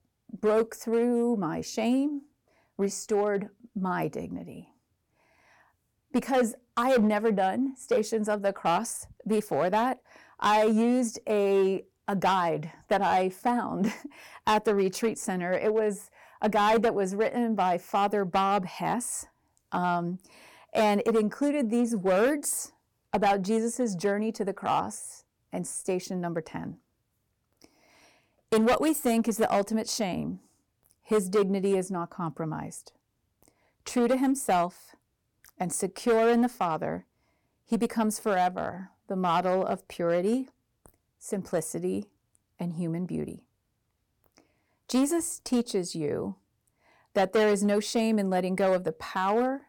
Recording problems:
distortion; slight; 4% of the sound clipped

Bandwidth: 18 kHz